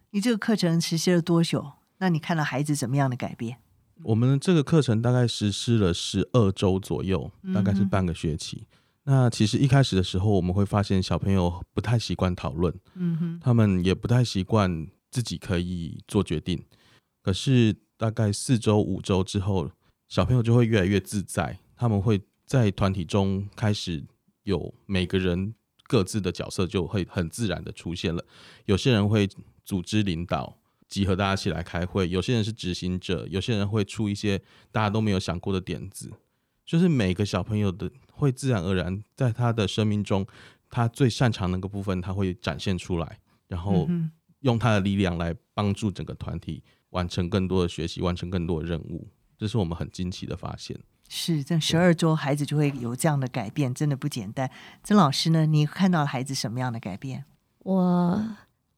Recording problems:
none

